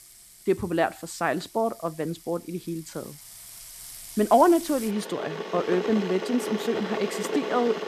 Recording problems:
household noises; loud; throughout; 7 dB below the speech

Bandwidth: 14 kHz